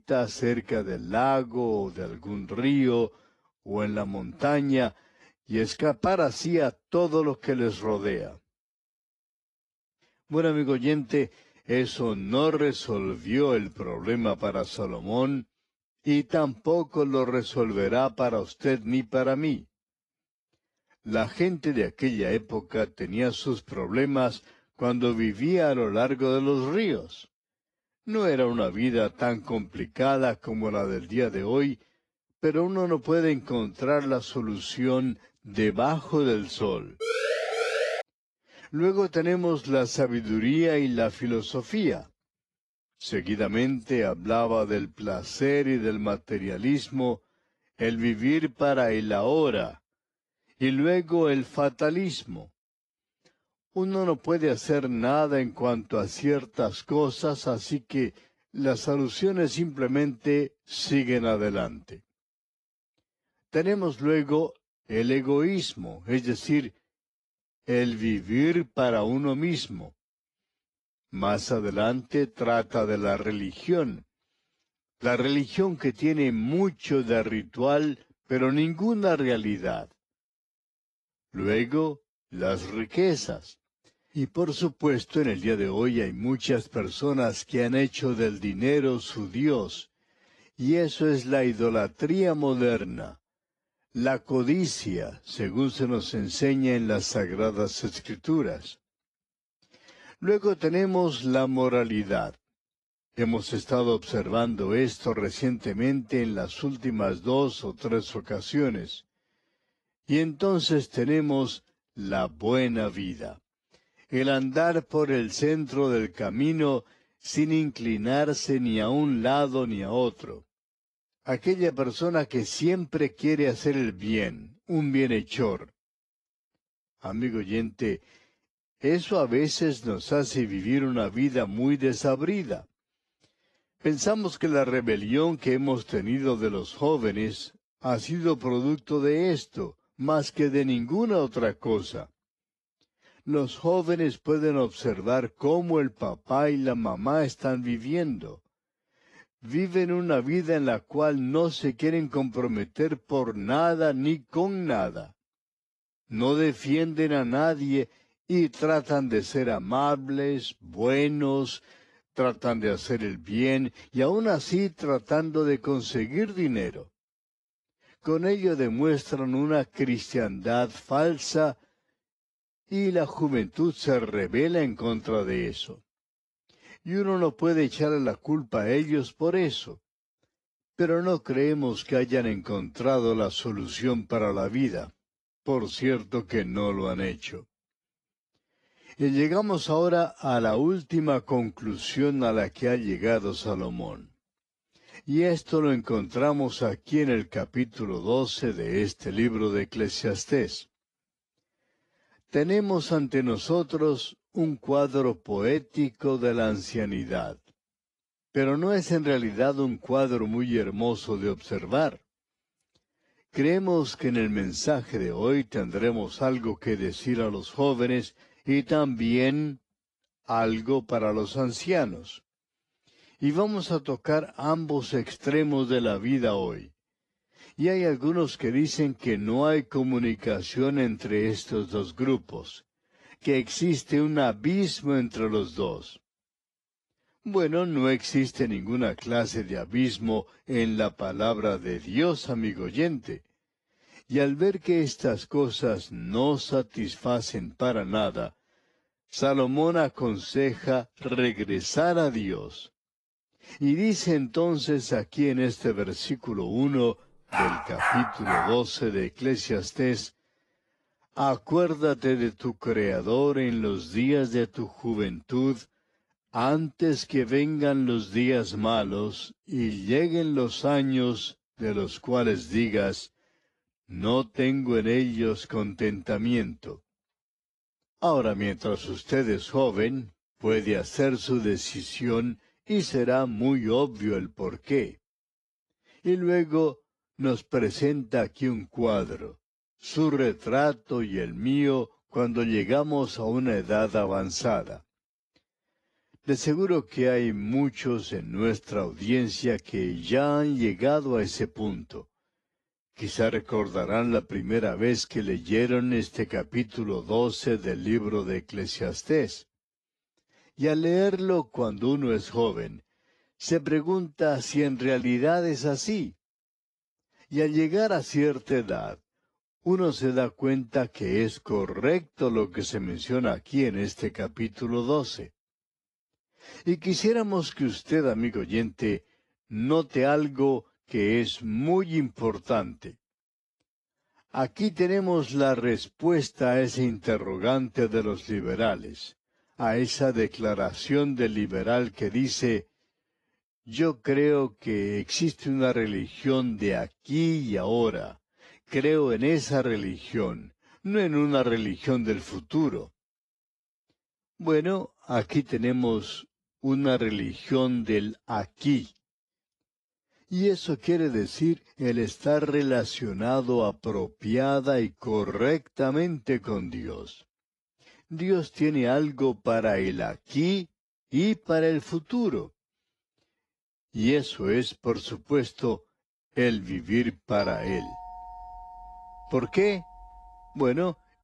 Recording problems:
wrong speed, natural pitch; too slow; 0.7 times normal speed
garbled, watery; slightly
siren; noticeable; from 37 to 38 s; peak level with the speech
dog barking; loud; from 4:17 to 4:19; peak 1 dB above the speech
doorbell; faint; from 6:17 on; peak 15 dB below the speech

